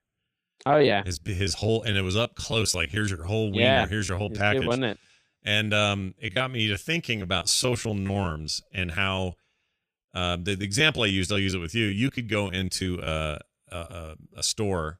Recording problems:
choppy; very; 15% of the speech affected

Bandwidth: 14.5 kHz